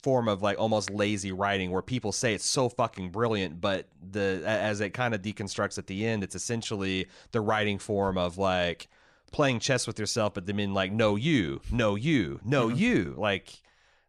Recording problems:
none

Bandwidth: 14.5 kHz